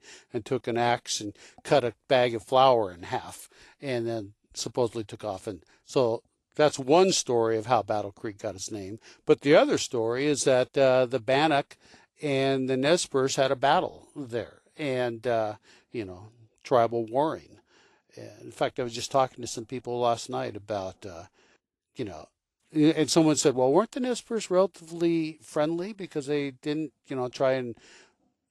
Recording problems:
garbled, watery; slightly; nothing above 11.5 kHz

